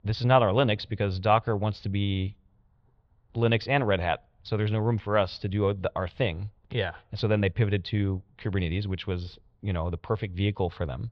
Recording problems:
muffled; very; fading above 3.5 kHz

